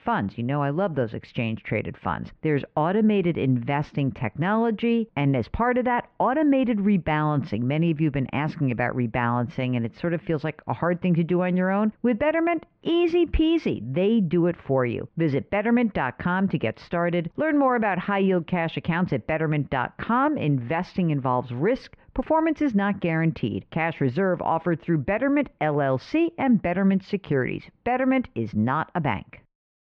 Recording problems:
muffled; very; fading above 2.5 kHz

